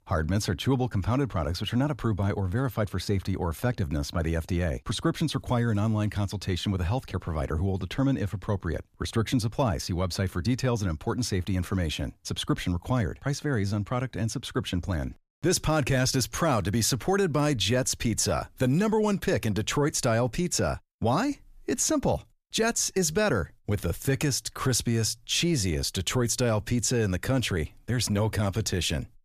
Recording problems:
none

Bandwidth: 14.5 kHz